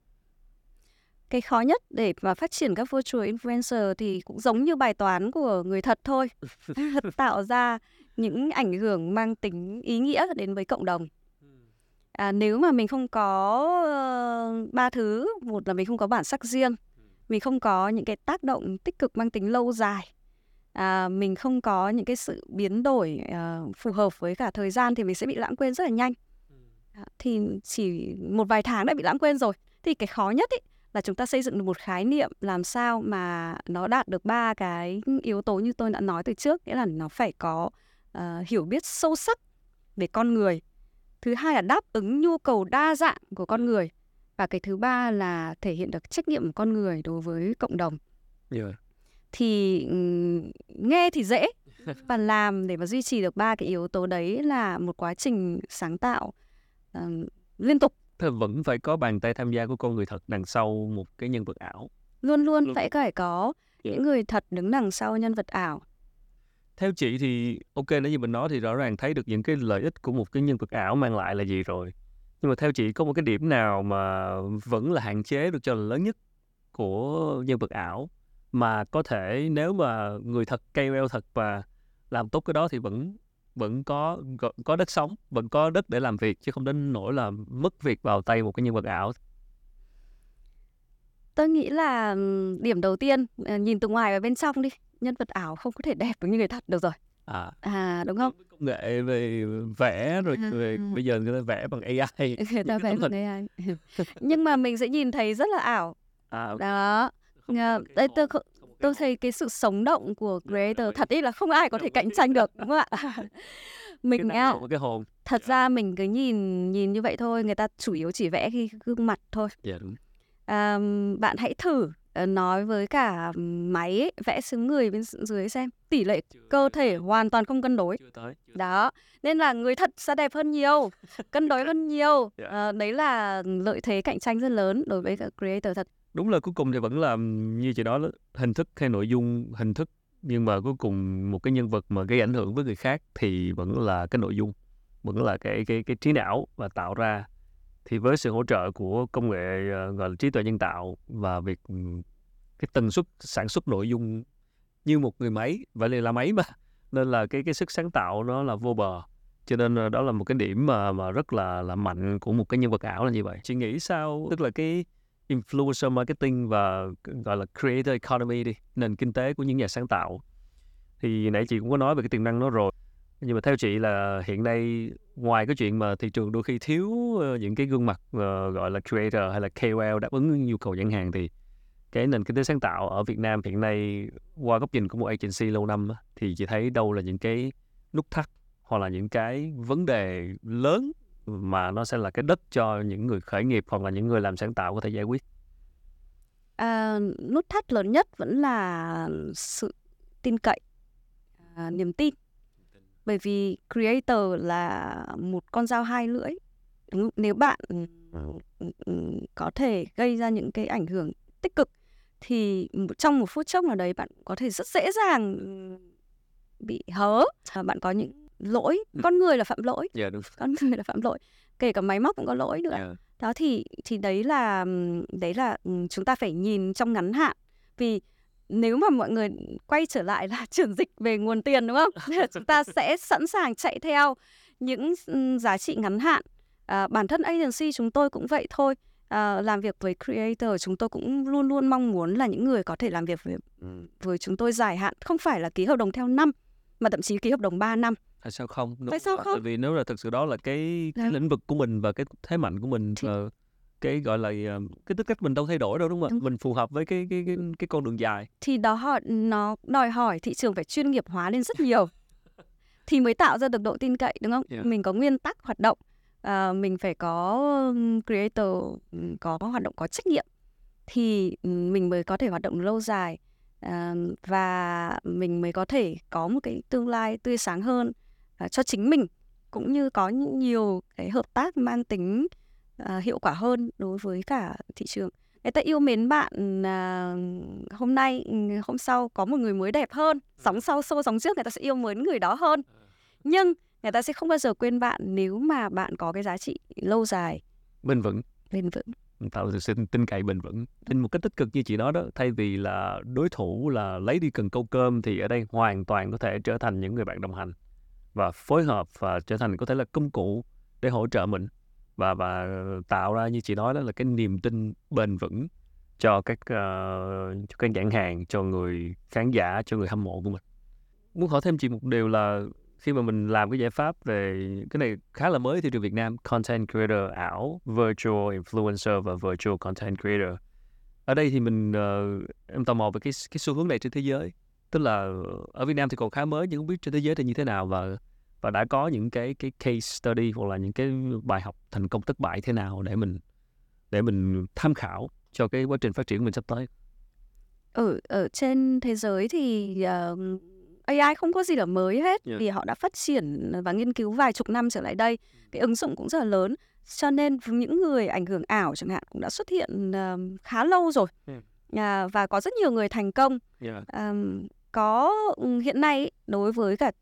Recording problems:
none

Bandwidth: 18 kHz